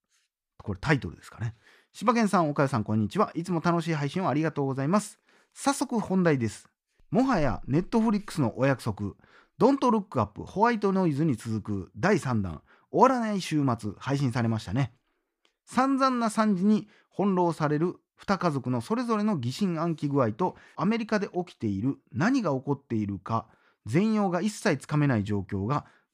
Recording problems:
none

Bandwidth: 15 kHz